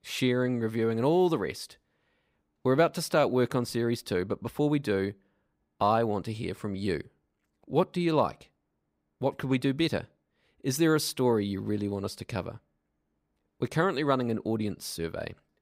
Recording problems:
none

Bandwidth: 15.5 kHz